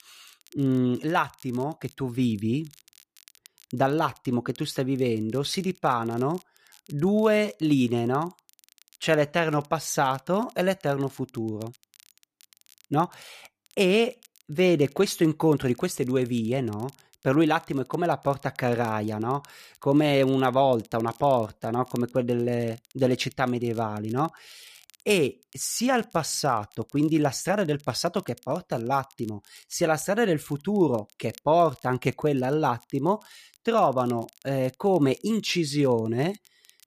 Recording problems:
crackle, like an old record; faint; 30 dB below the speech

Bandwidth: 14.5 kHz